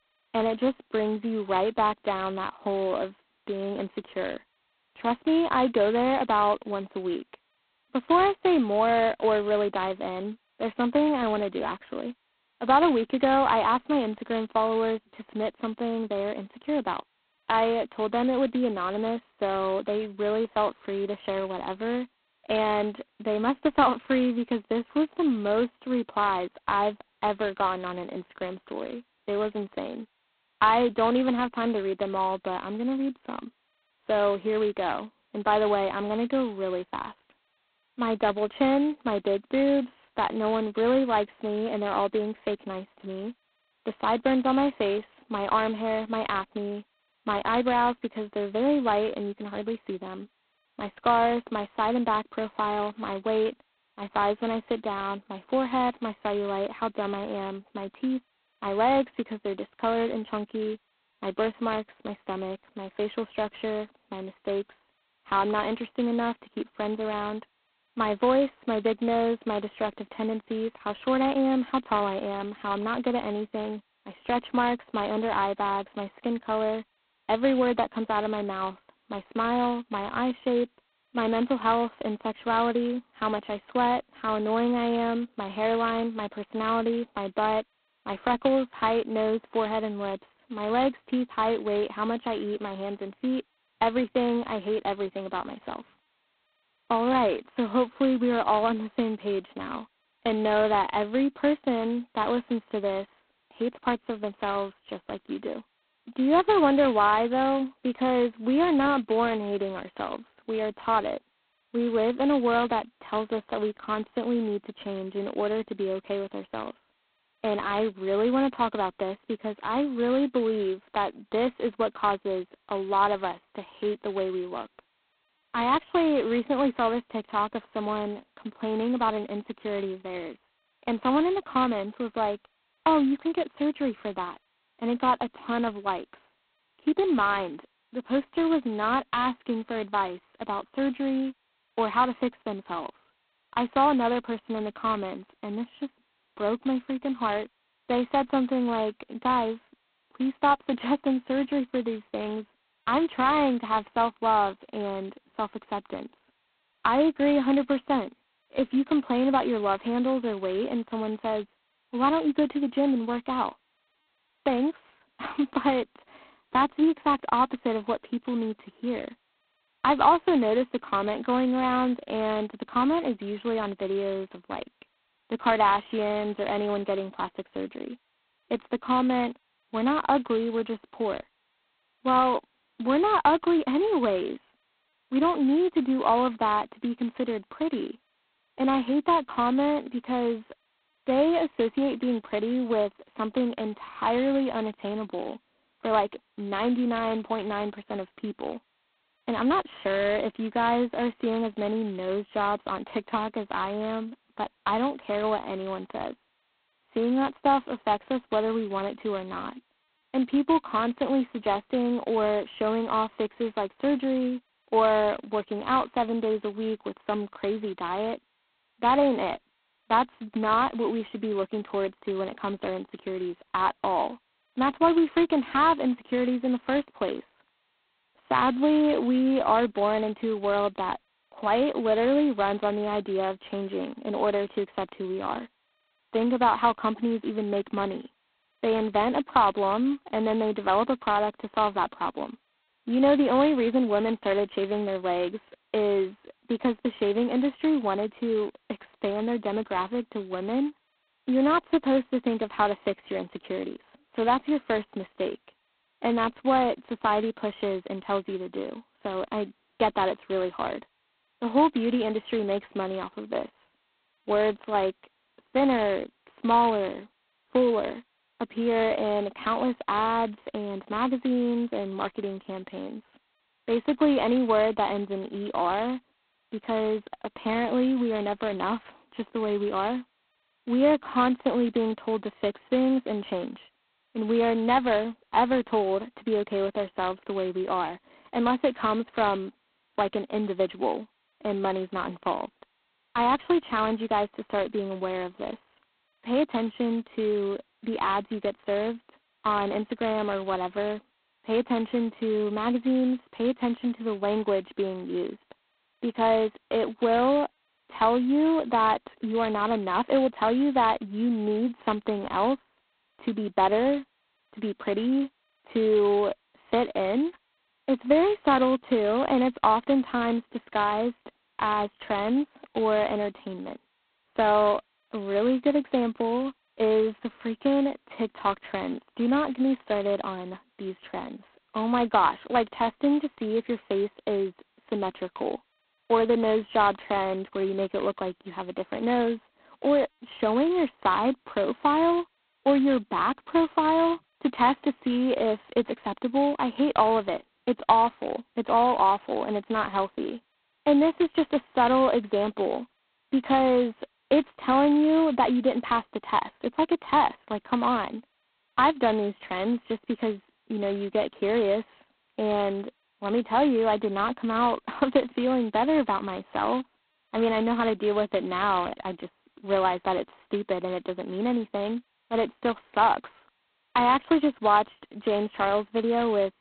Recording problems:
phone-call audio; poor line; nothing above 4 kHz
muffled; very slightly; fading above 1 kHz

